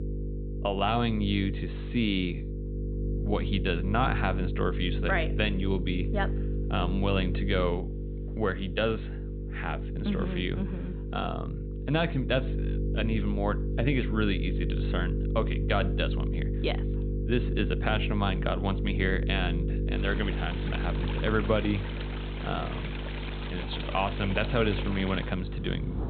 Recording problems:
high frequencies cut off; severe; nothing above 4 kHz
electrical hum; loud; throughout; 50 Hz, 10 dB below the speech
rain or running water; noticeable; from 20 s on; 10 dB below the speech

